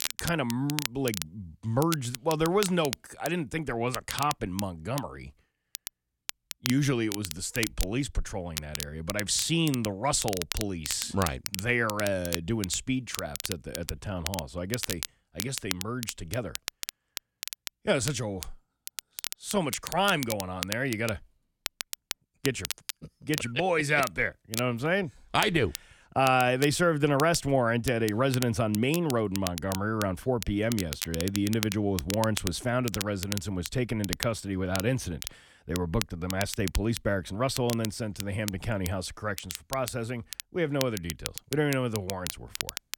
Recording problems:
crackle, like an old record; loud; 8 dB below the speech

